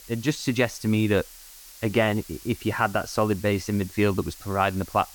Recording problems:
hiss; noticeable; throughout; 20 dB below the speech

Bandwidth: 18 kHz